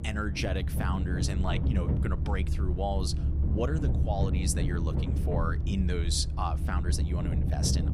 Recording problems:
low rumble; loud; throughout; 7 dB below the speech

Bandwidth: 15.5 kHz